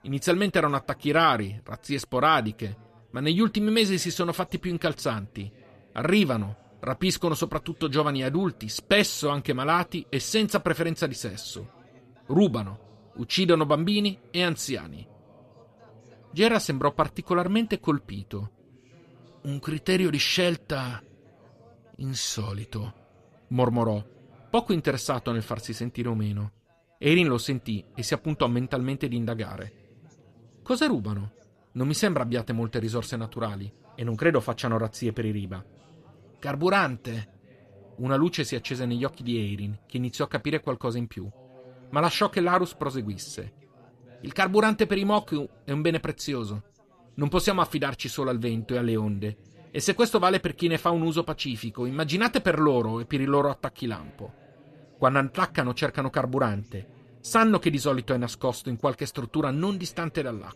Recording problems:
background chatter; faint; throughout; 4 voices, 30 dB below the speech

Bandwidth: 14 kHz